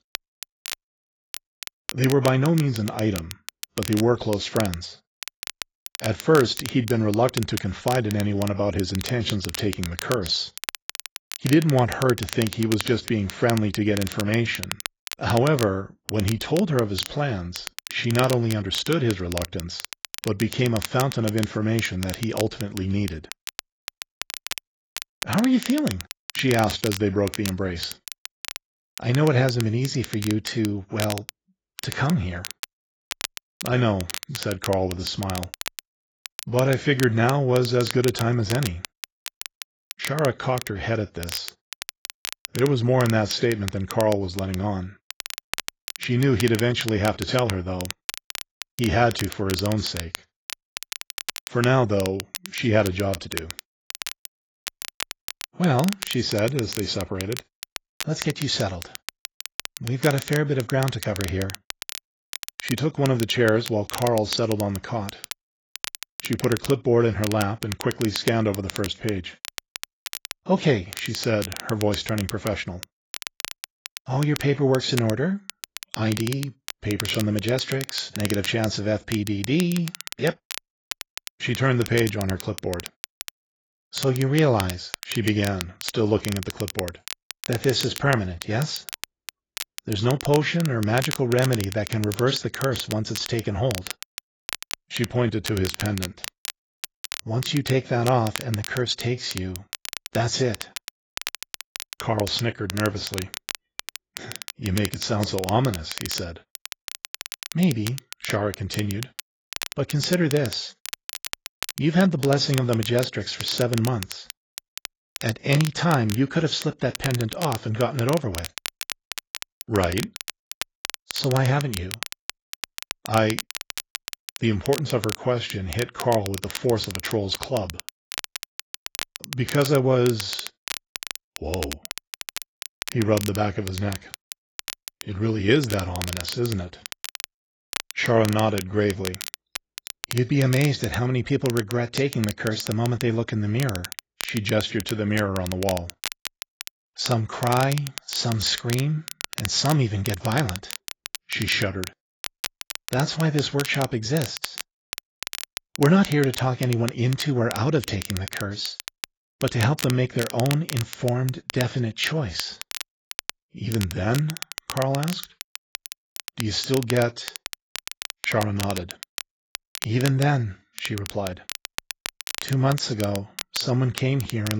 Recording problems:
garbled, watery; badly; nothing above 7.5 kHz
crackle, like an old record; noticeable; 10 dB below the speech
abrupt cut into speech; at the end

